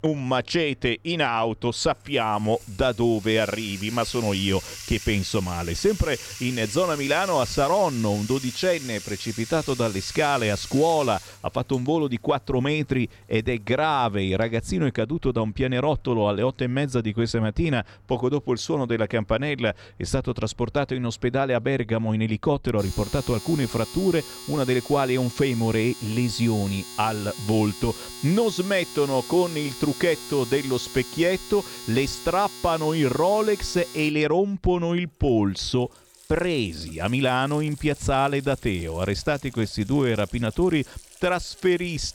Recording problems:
household noises; noticeable; throughout; 15 dB below the speech

